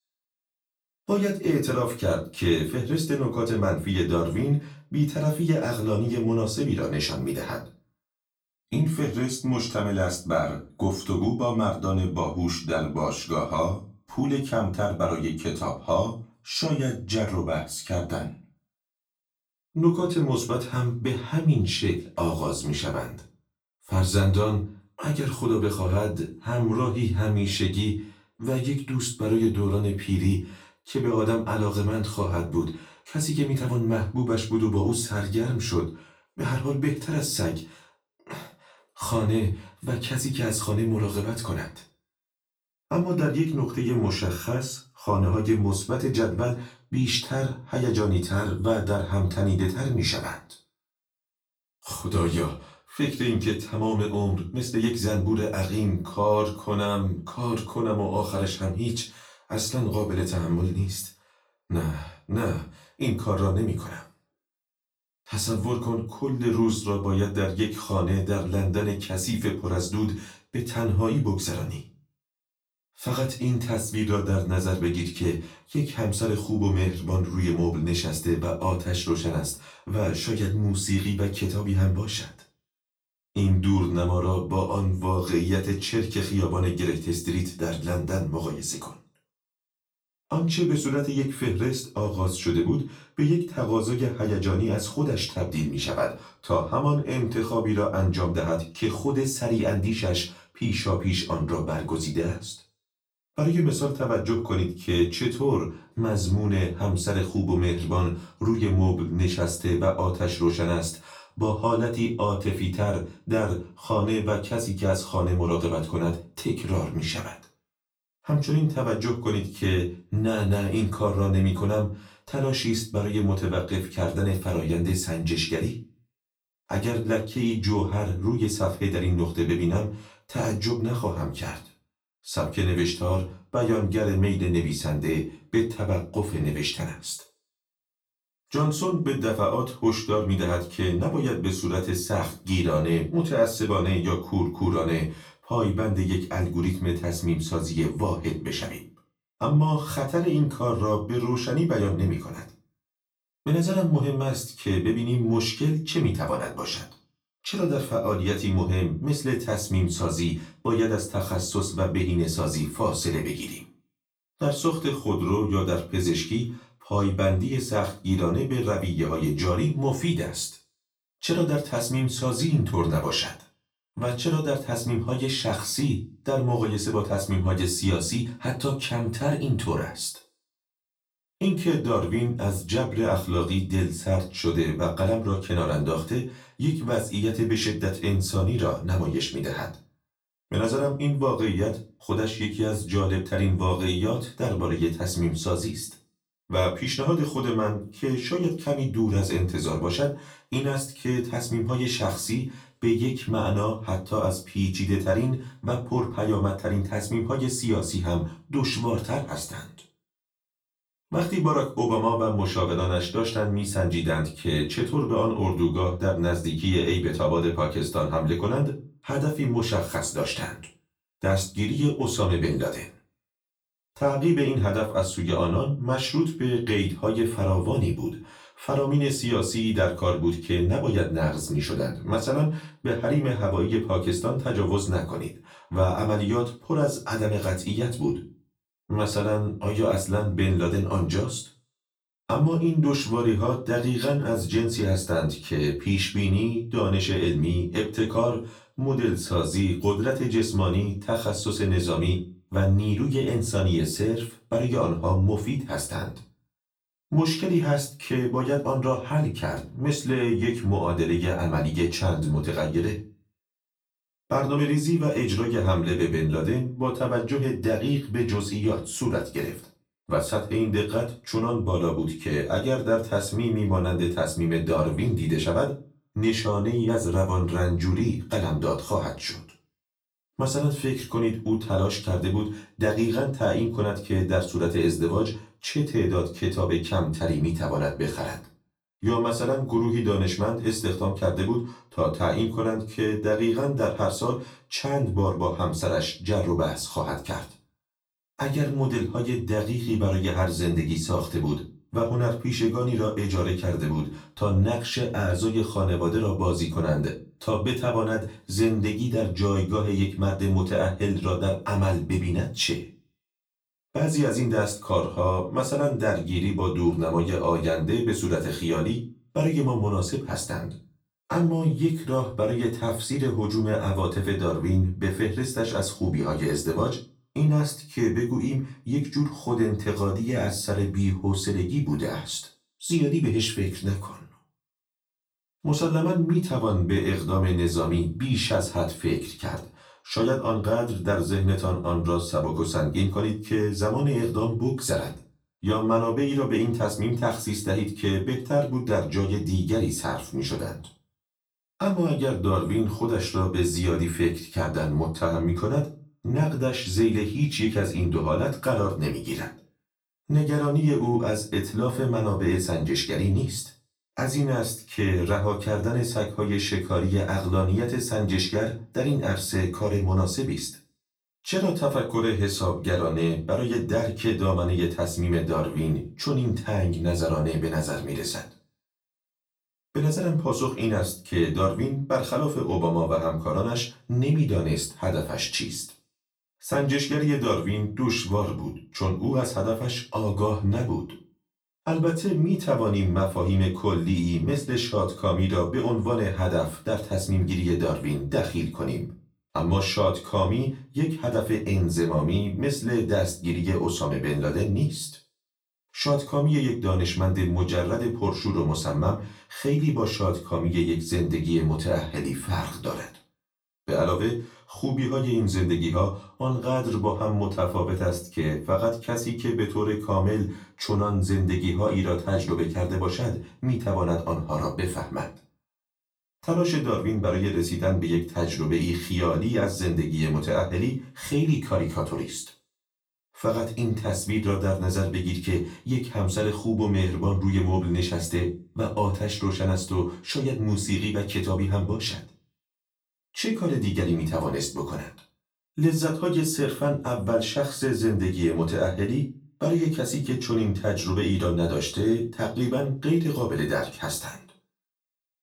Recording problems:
off-mic speech; far
room echo; slight; dies away in 0.3 s

